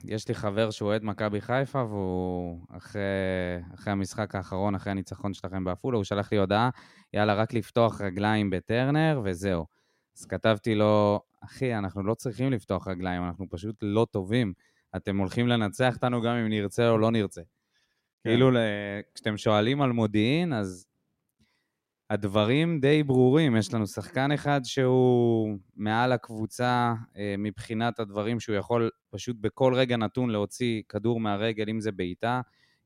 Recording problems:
none

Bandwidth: 16 kHz